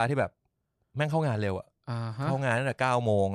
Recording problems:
abrupt cut into speech; at the start and the end

